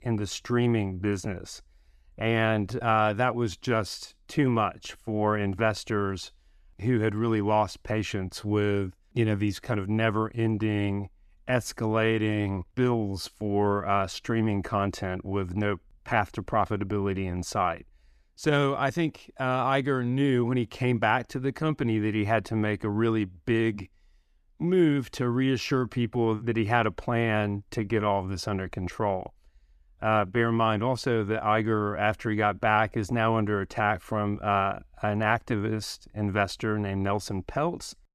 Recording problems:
none

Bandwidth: 14.5 kHz